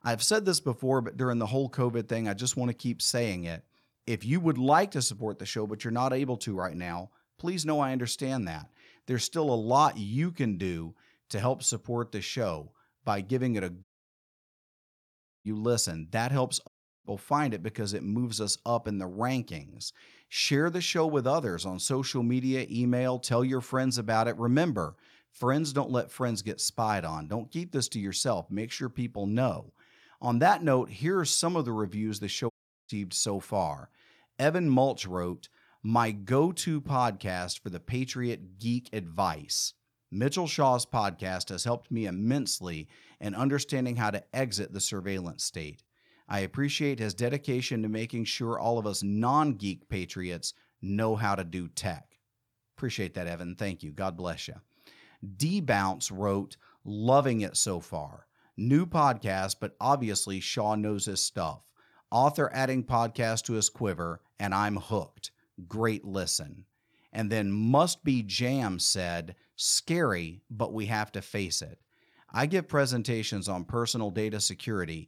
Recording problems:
audio cutting out; at 14 s for 1.5 s, at 17 s and at 33 s

